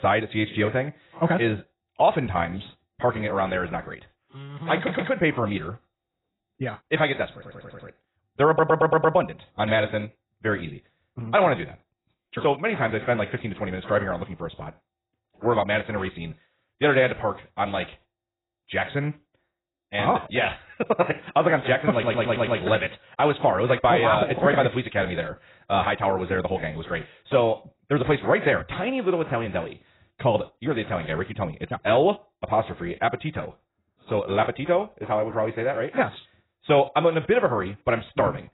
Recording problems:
garbled, watery; badly; nothing above 4 kHz
wrong speed, natural pitch; too fast; 1.5 times normal speed
abrupt cut into speech; at the start
audio stuttering; 4 times, first at 5 s

